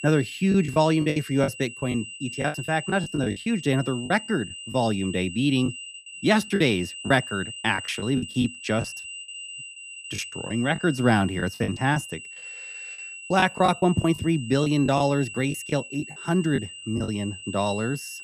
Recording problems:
high-pitched whine; noticeable; throughout; 3 kHz, 10 dB below the speech
choppy; very; 10% of the speech affected

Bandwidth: 15 kHz